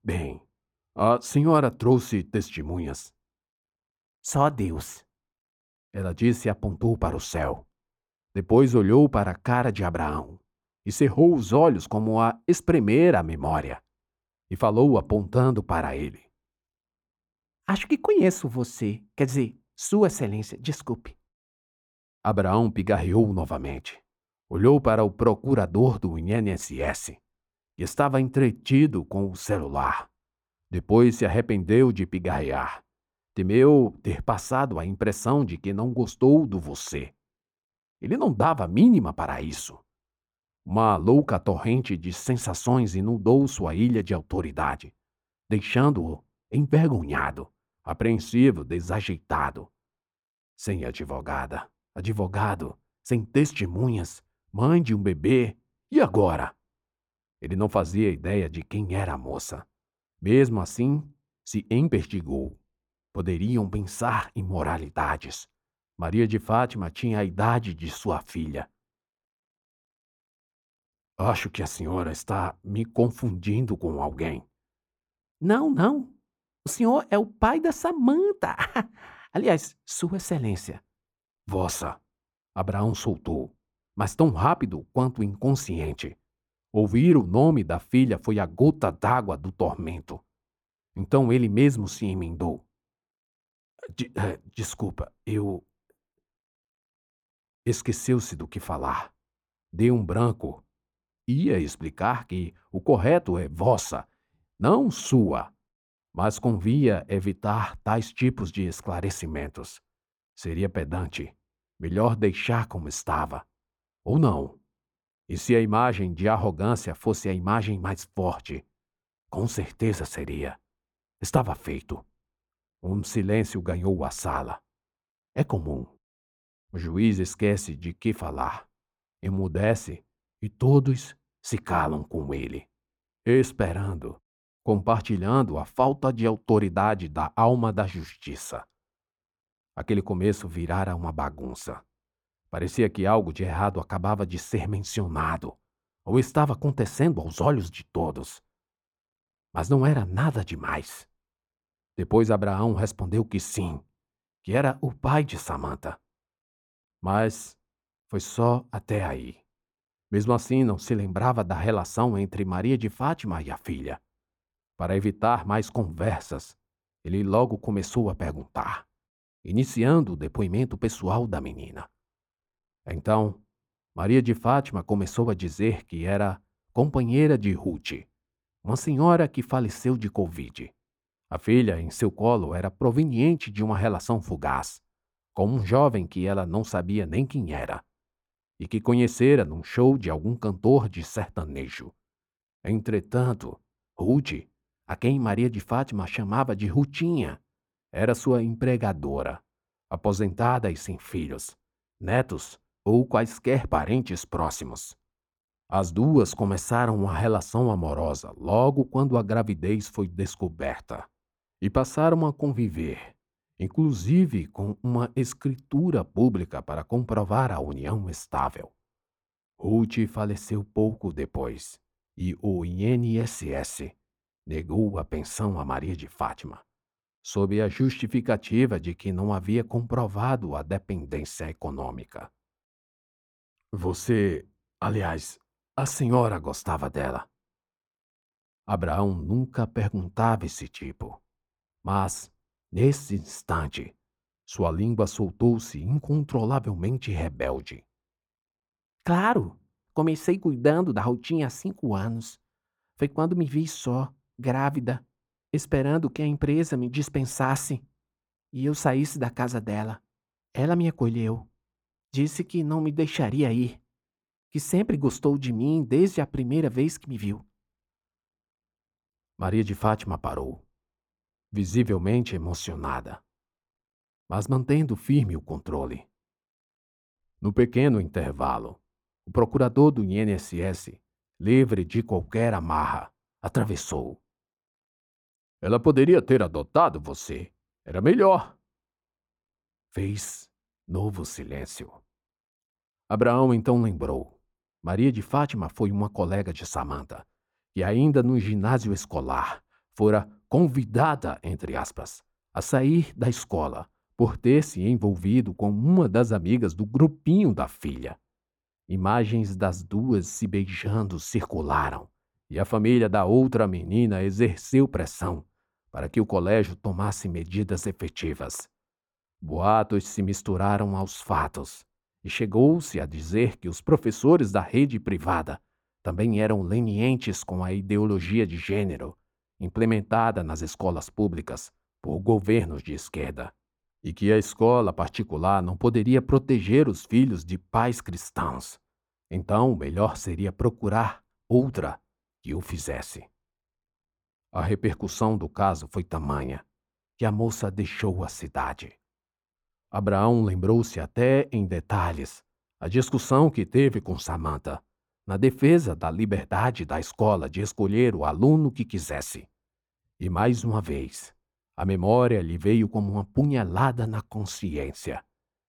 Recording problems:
muffled; slightly; fading above 1.5 kHz

